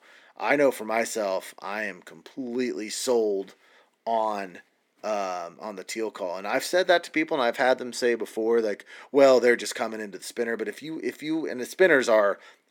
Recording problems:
thin; very slightly; fading below 250 Hz

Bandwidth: 18 kHz